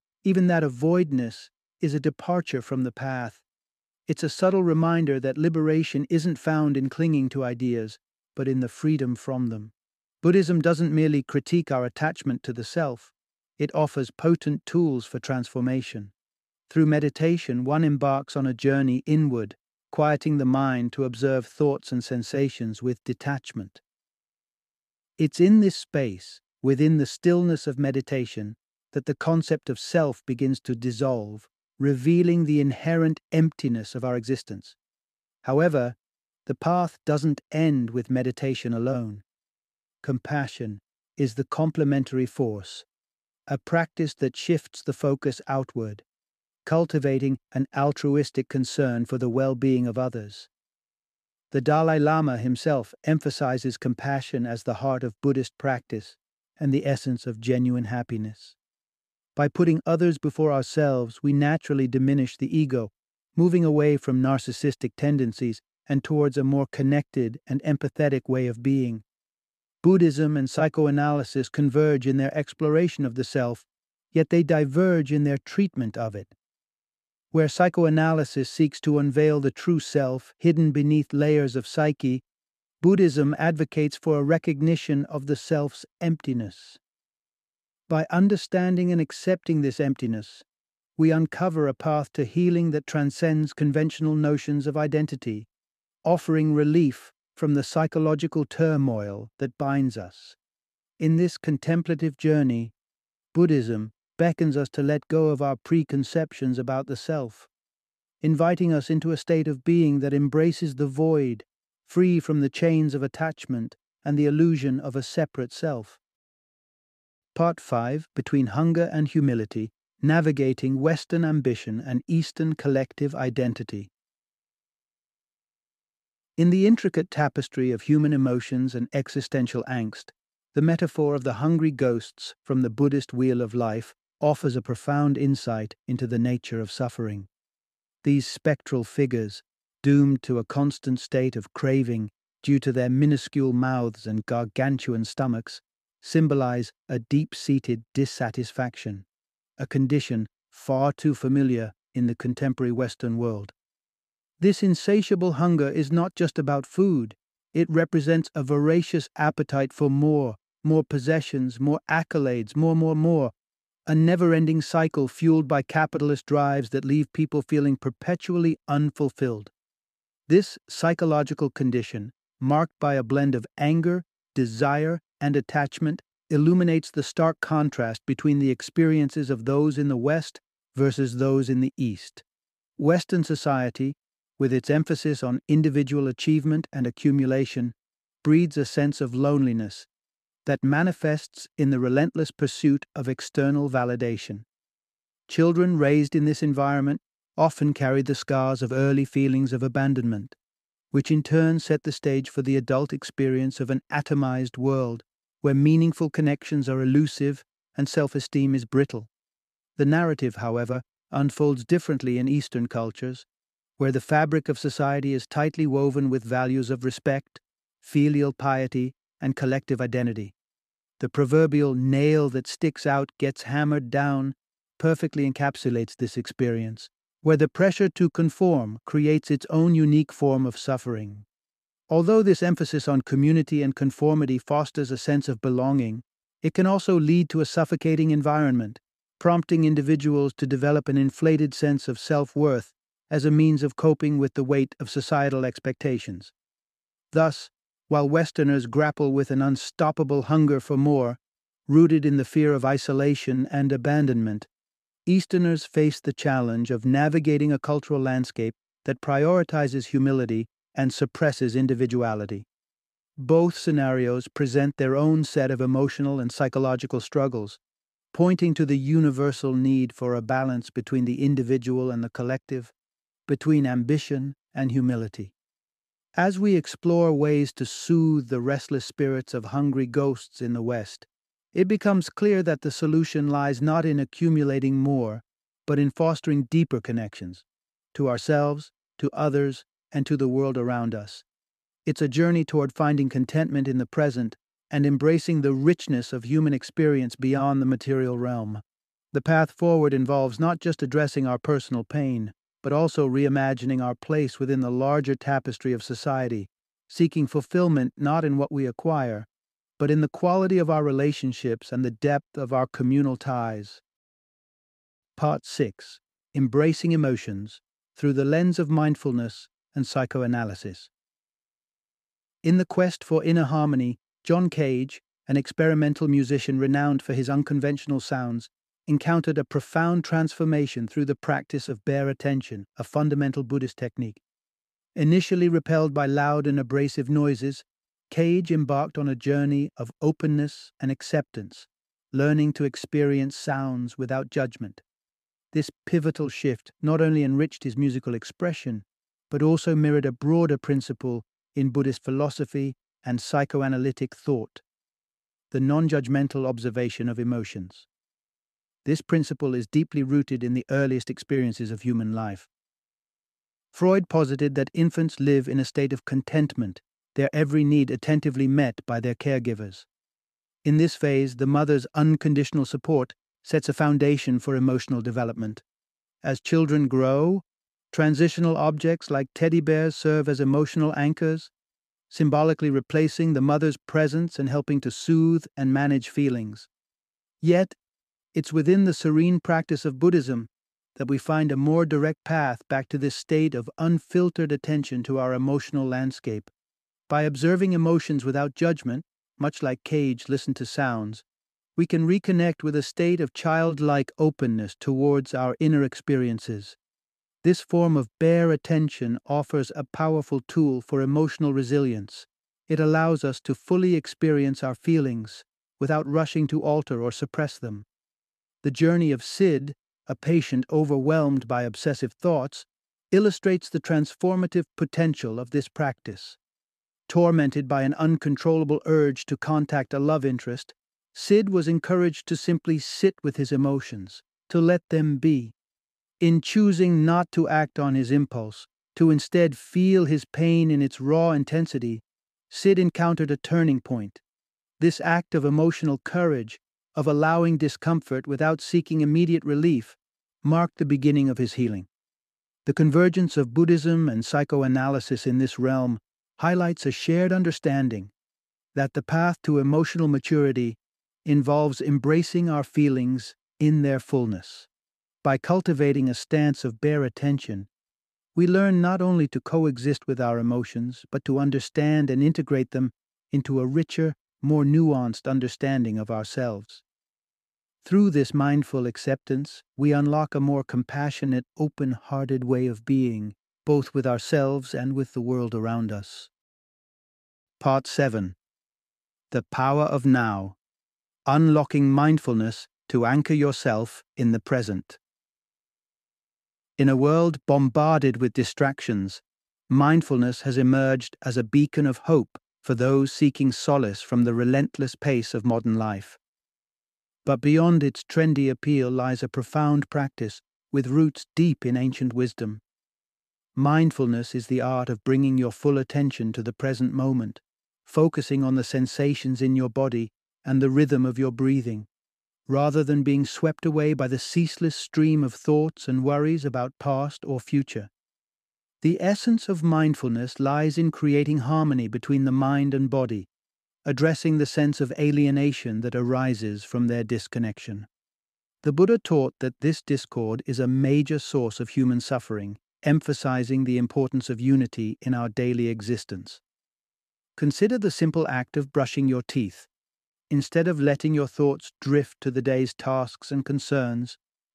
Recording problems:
none

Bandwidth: 14.5 kHz